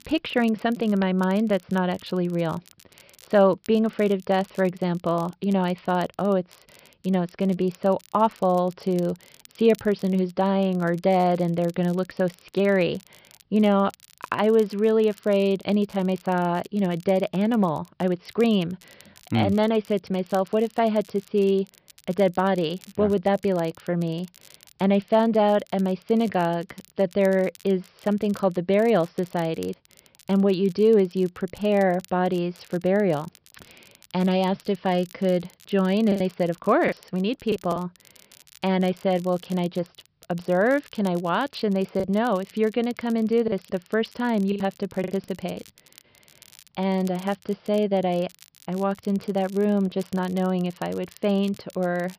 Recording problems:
high frequencies cut off; noticeable; nothing above 5.5 kHz
crackle, like an old record; faint; 25 dB below the speech
choppy; very; from 36 to 38 s and from 42 to 46 s; 7% of the speech affected

